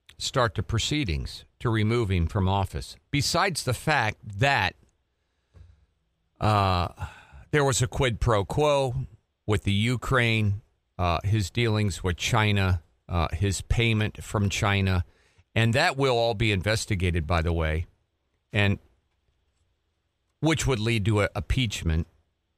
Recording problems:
none

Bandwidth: 15 kHz